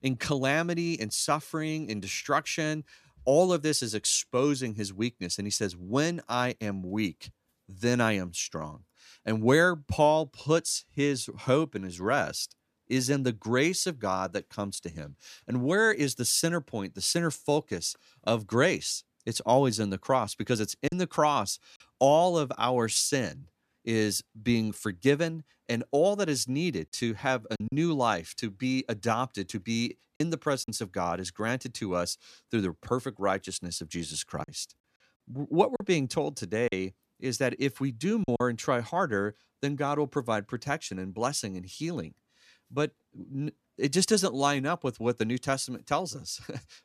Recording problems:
choppy; occasionally; at 21 s, from 28 to 31 s and from 34 to 38 s; 5% of the speech affected

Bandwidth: 14.5 kHz